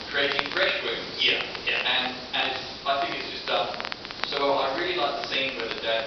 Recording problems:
off-mic speech; far
room echo; noticeable; dies away in 0.8 s
thin; somewhat; fading below 350 Hz
high frequencies cut off; noticeable; nothing above 5.5 kHz
hiss; noticeable; throughout; 10 dB below the speech
crackle, like an old record; noticeable; 10 dB below the speech

